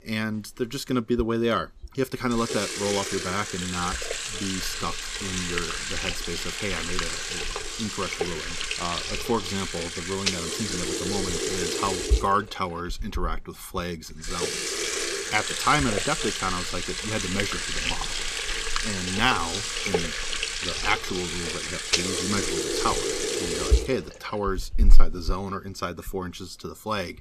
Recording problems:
household noises; very loud; throughout; 2 dB above the speech

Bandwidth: 14.5 kHz